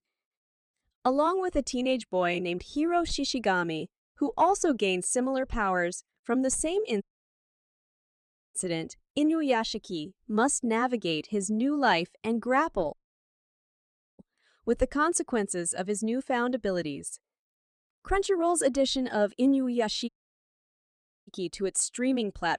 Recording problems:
audio cutting out; at 7 s for 1.5 s, at 13 s for 1 s and at 20 s for 1 s

